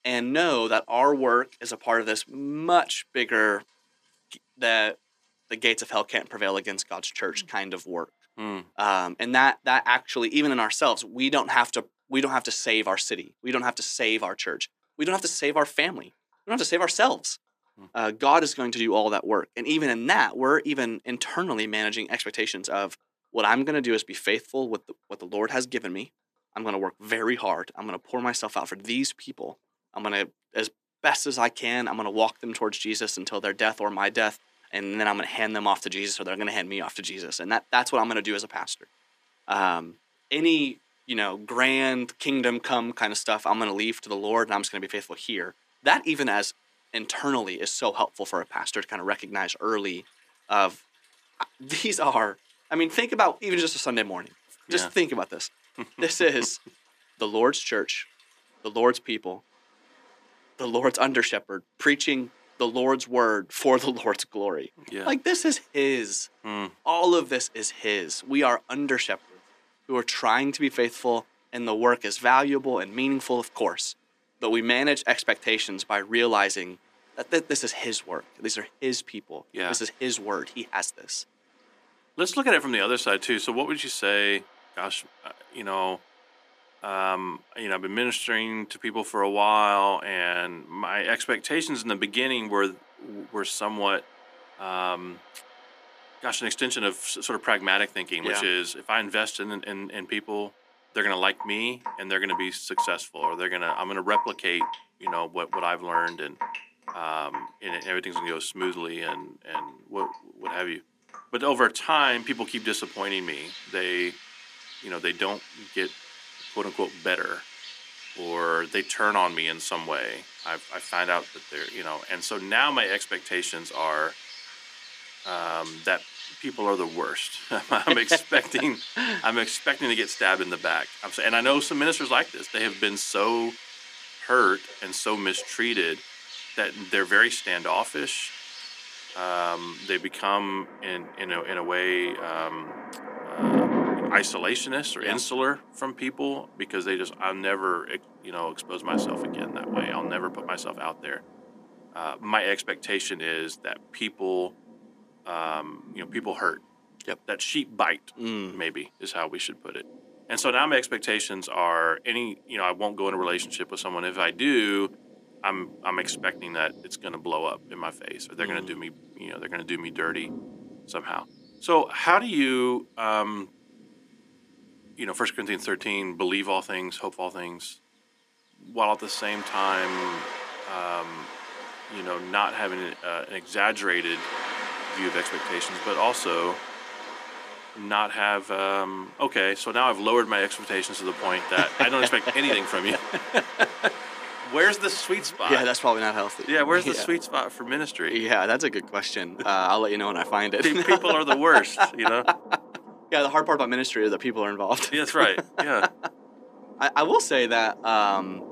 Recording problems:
thin; somewhat; fading below 250 Hz
rain or running water; noticeable; throughout; 10 dB below the speech

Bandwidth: 14.5 kHz